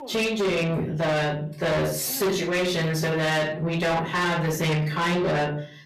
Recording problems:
distortion; heavy; 7 dB below the speech
off-mic speech; far
room echo; slight; dies away in 0.4 s
voice in the background; faint; throughout; 20 dB below the speech

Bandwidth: 14.5 kHz